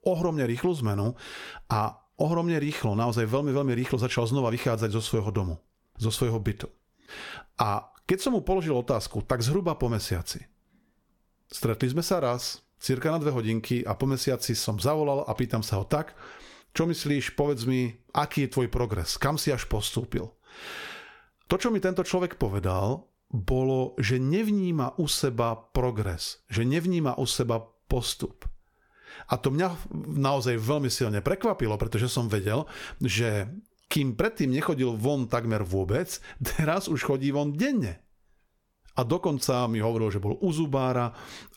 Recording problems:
squashed, flat; somewhat

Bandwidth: 17.5 kHz